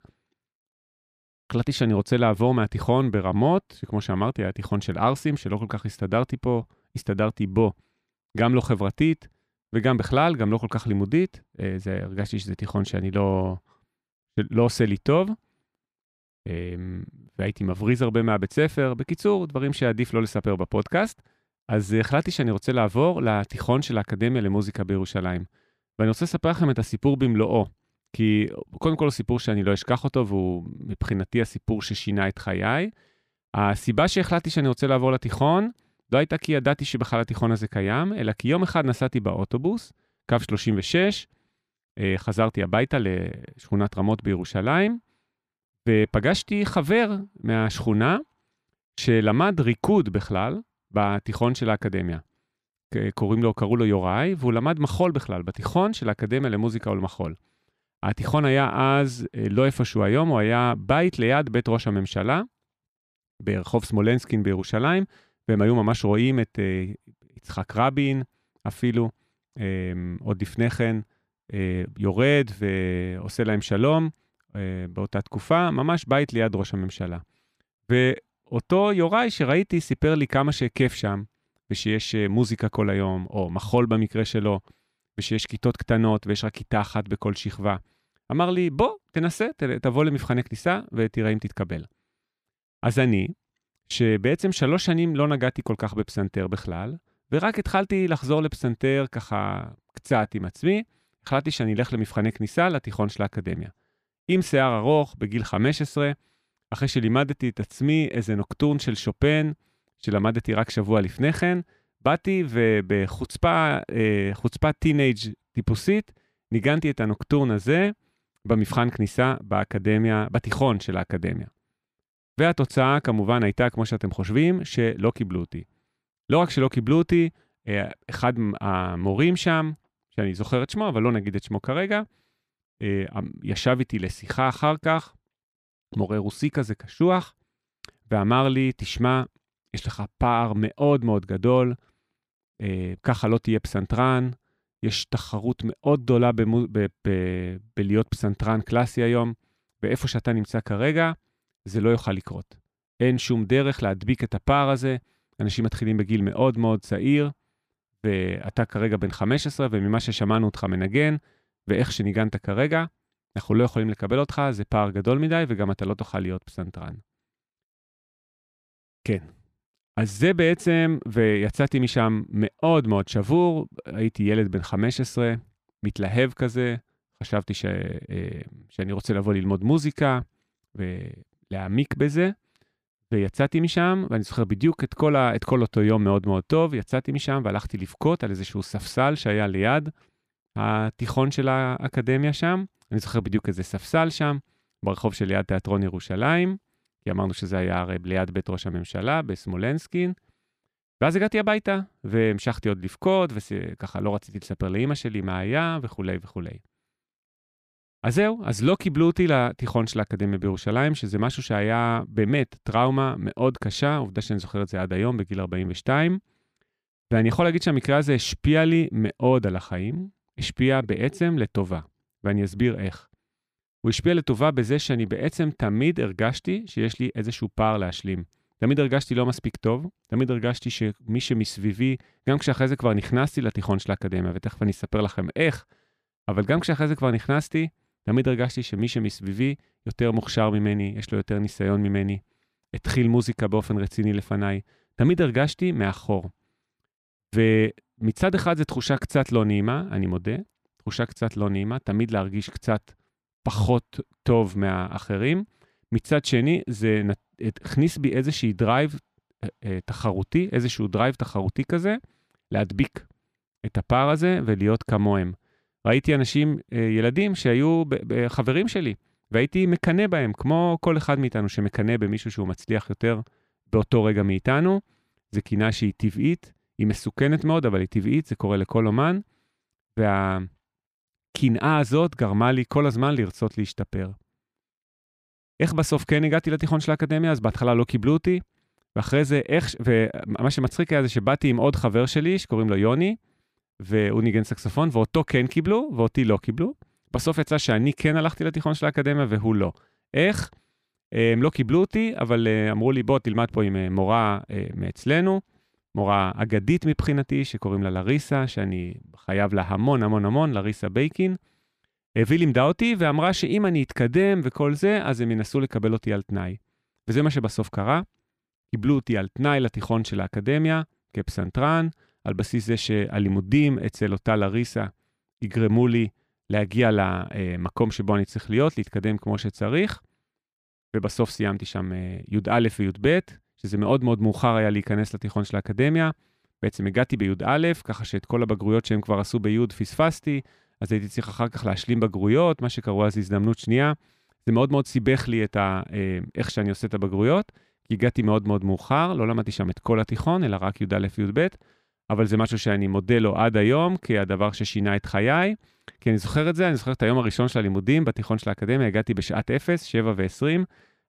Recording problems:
none

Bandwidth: 14.5 kHz